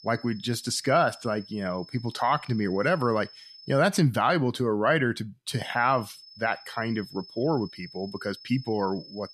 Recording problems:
high-pitched whine; noticeable; until 4 s and from 5.5 s on; 5 kHz, 20 dB below the speech

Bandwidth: 14.5 kHz